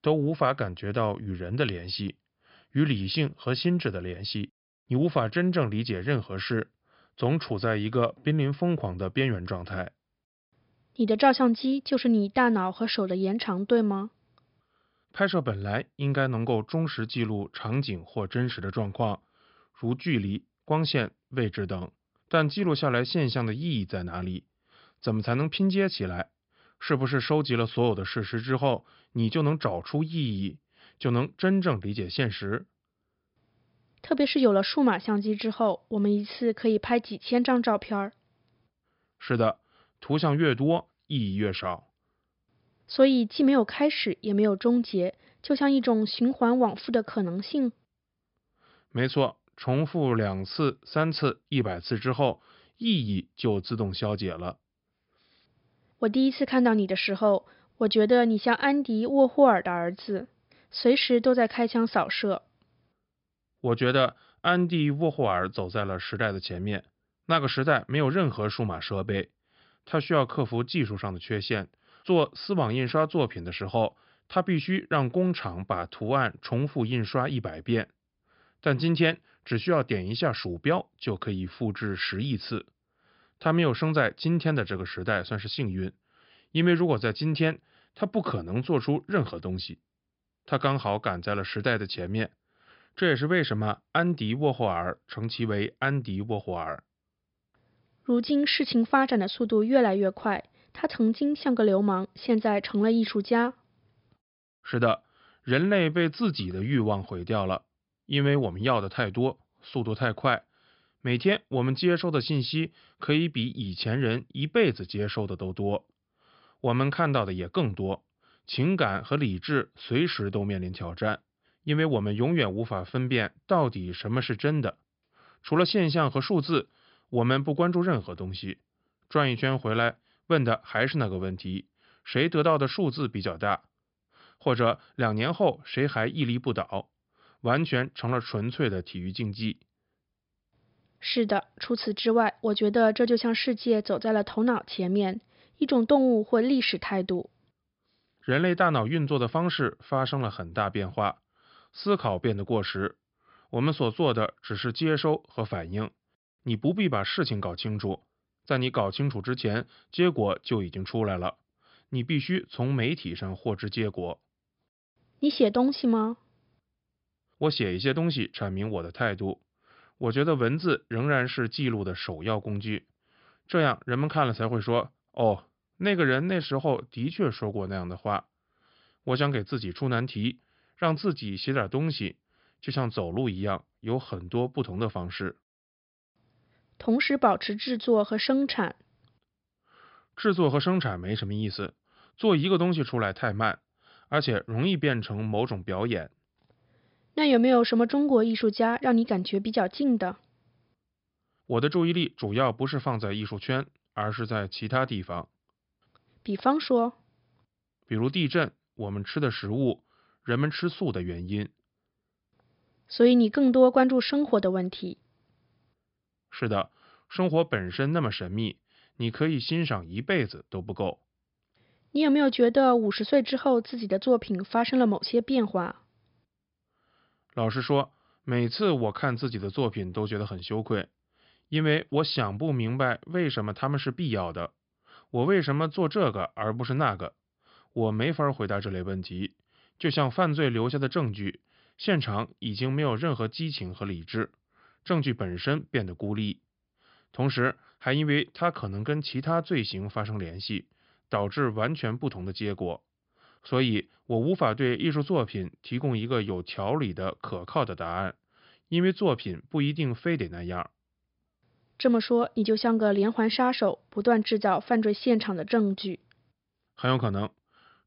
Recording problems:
high frequencies cut off; noticeable; nothing above 5.5 kHz

